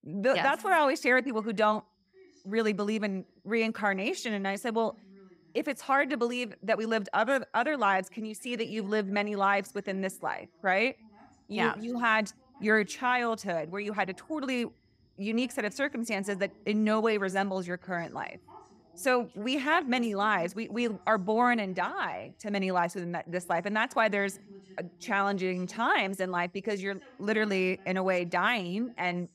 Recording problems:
voice in the background; faint; throughout; 25 dB below the speech

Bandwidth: 15.5 kHz